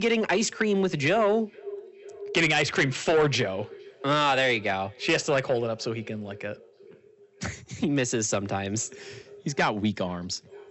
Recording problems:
high frequencies cut off; noticeable; nothing above 8 kHz
echo of what is said; faint; throughout; 460 ms later, 20 dB below the speech
distortion; slight; 10 dB below the speech
abrupt cut into speech; at the start

